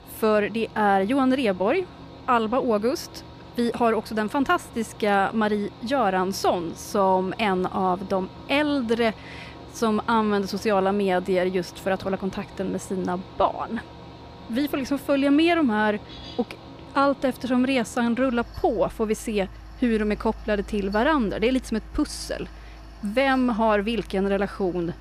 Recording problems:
machinery noise; noticeable; throughout; 20 dB below the speech

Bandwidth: 14.5 kHz